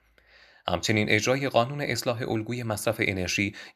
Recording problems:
none

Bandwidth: 14 kHz